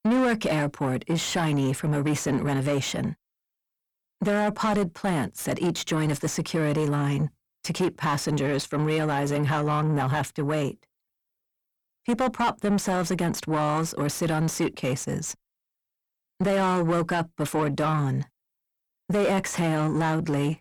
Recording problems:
distortion; heavy; 7 dB below the speech

